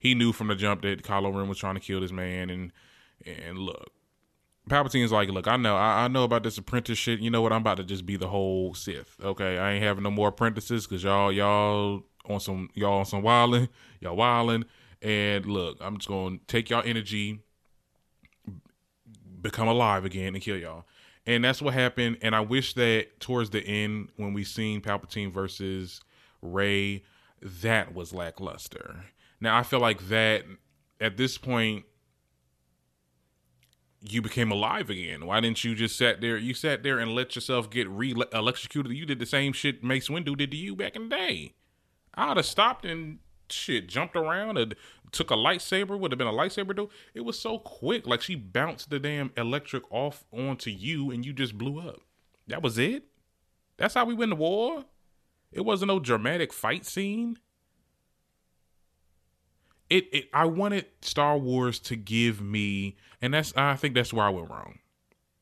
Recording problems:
none

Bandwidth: 13.5 kHz